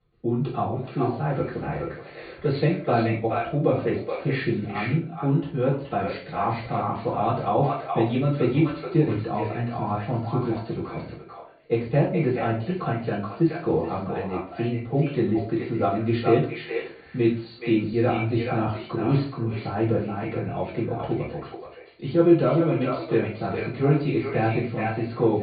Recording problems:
echo of what is said; strong; throughout; 430 ms later, 9 dB below the speech
off-mic speech; far
high frequencies cut off; severe; nothing above 4.5 kHz
room echo; slight; dies away in 0.3 s

